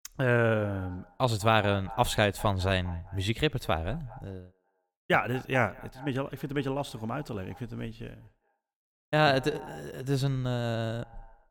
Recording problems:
echo of what is said; faint; throughout; 200 ms later, 20 dB below the speech

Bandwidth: 18 kHz